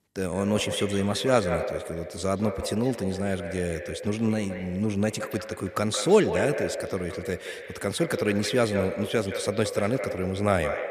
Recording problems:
echo of what is said; strong; throughout; 170 ms later, 7 dB below the speech

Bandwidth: 14.5 kHz